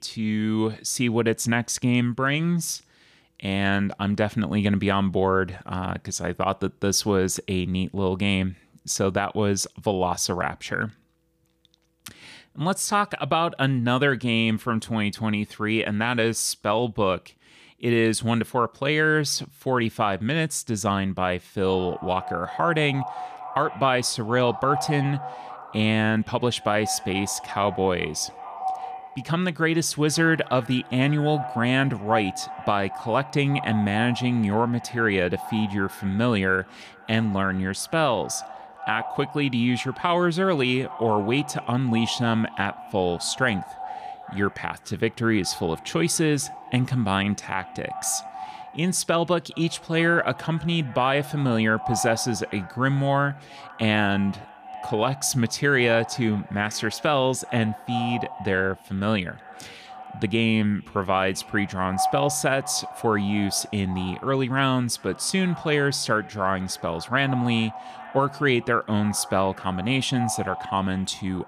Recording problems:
echo of what is said; noticeable; from 22 s on; 400 ms later, 15 dB below the speech

